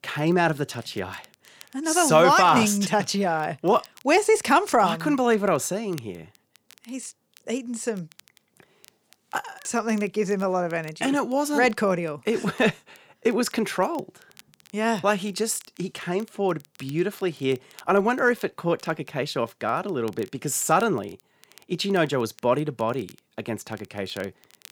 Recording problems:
crackle, like an old record; faint; 30 dB below the speech

